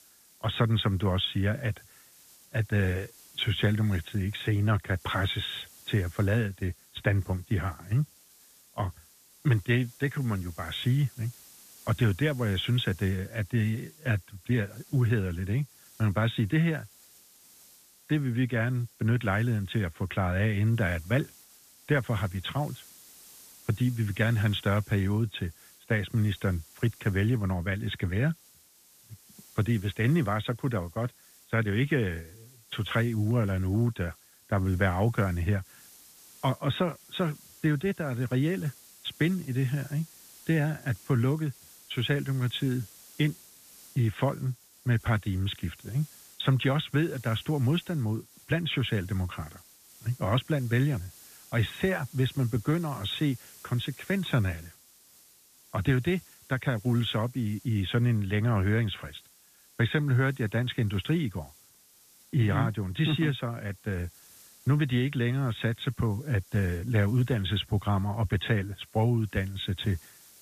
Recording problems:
high frequencies cut off; severe; nothing above 4 kHz
hiss; faint; throughout; 25 dB below the speech

